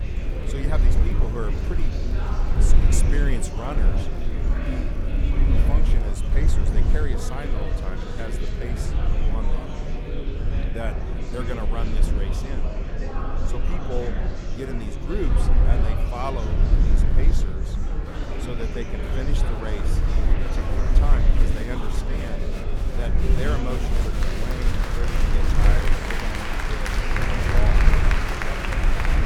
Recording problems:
murmuring crowd; very loud; throughout; 2 dB above the speech
low rumble; loud; throughout; 5 dB below the speech

